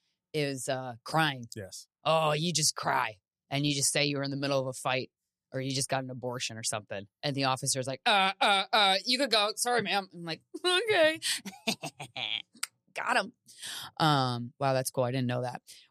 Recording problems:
none

